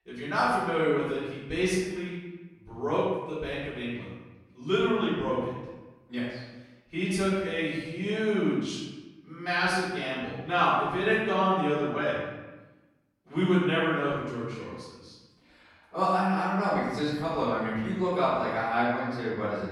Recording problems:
room echo; strong; dies away in 1 s
off-mic speech; far

